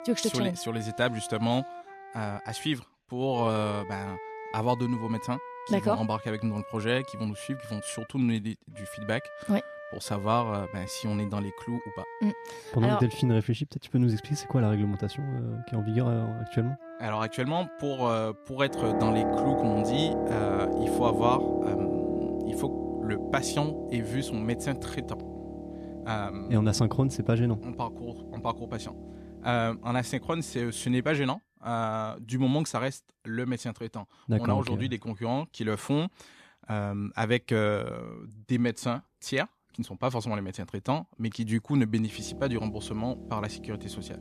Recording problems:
background music; loud; throughout; 6 dB below the speech

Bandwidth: 14.5 kHz